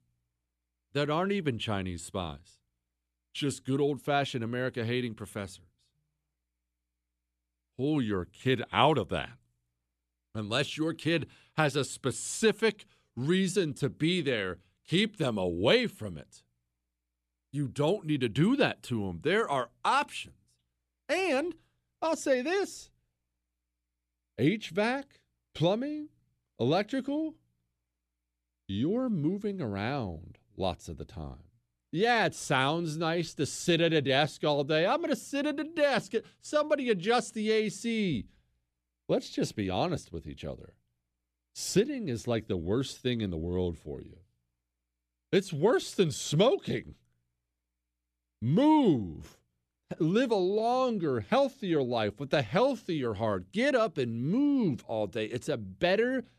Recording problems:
none

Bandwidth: 14 kHz